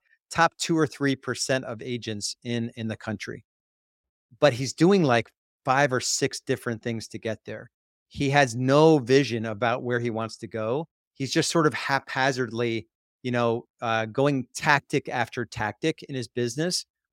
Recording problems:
none

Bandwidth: 16 kHz